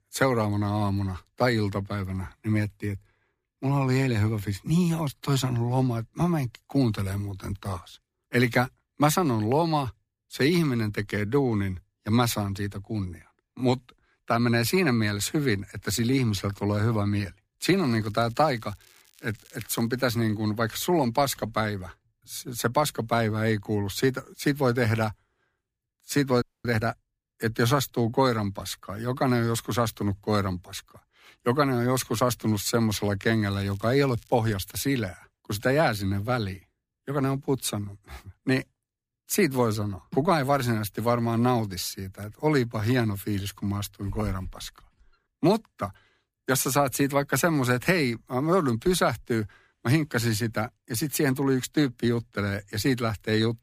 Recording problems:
crackling; faint; from 18 to 20 s and from 33 to 34 s; 30 dB below the speech
audio freezing; at 26 s

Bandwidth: 15 kHz